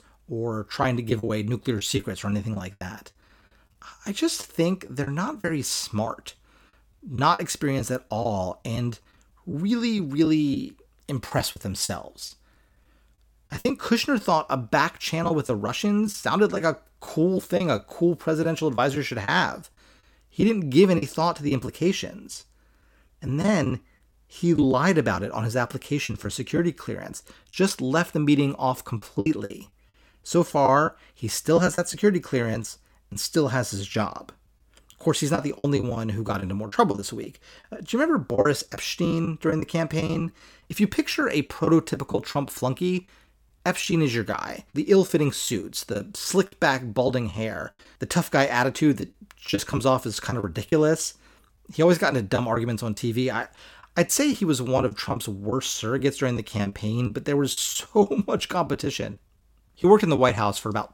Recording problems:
choppy; very; 7% of the speech affected

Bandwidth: 17.5 kHz